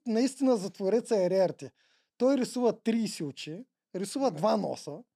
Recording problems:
none

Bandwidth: 14.5 kHz